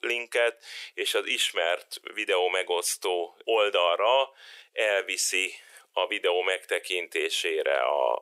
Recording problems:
thin; very; fading below 400 Hz

